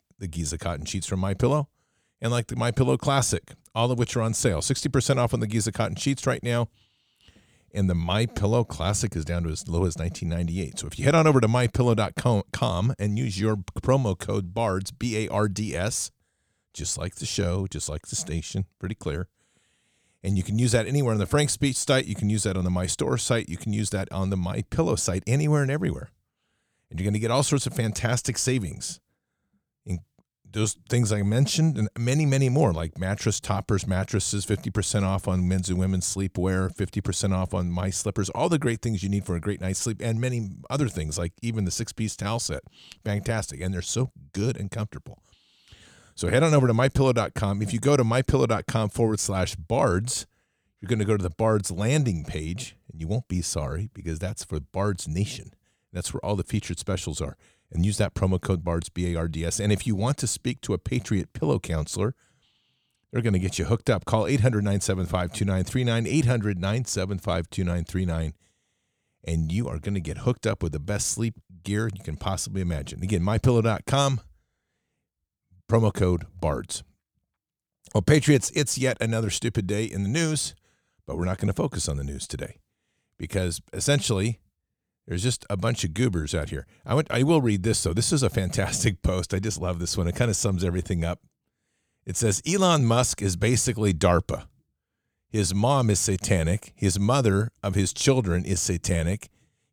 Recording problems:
none

